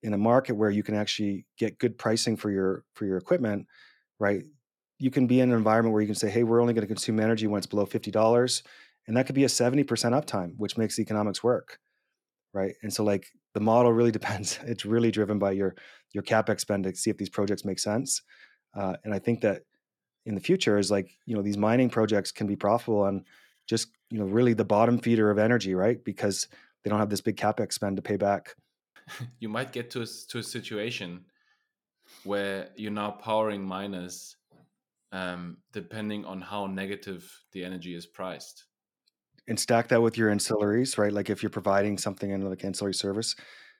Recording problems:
none

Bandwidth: 18 kHz